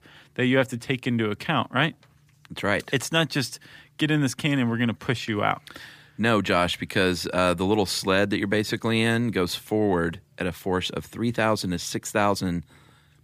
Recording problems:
none

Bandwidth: 15 kHz